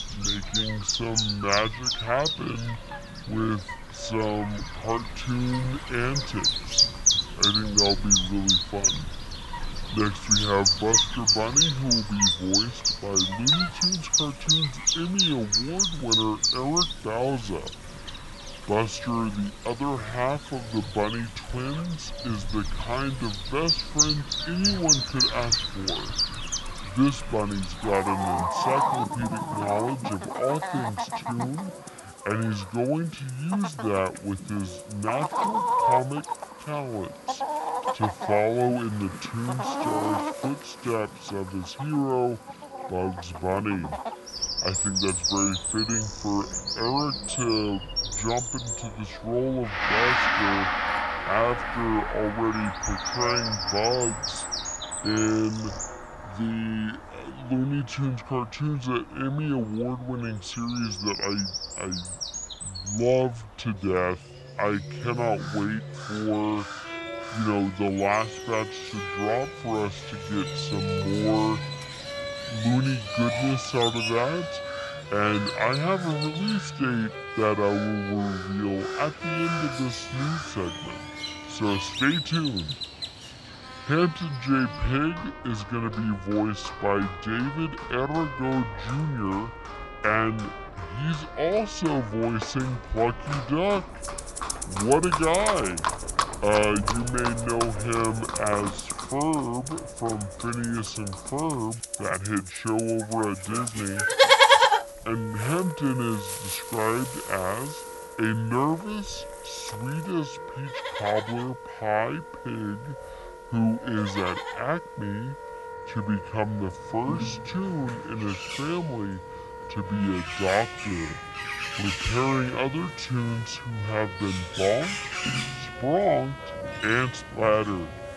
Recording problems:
wrong speed and pitch; too slow and too low; 0.6 times normal speed
echo of what is said; faint; throughout; 590 ms later, 20 dB below the speech
animal sounds; very loud; throughout; 1 dB above the speech
background music; loud; throughout; 7 dB below the speech

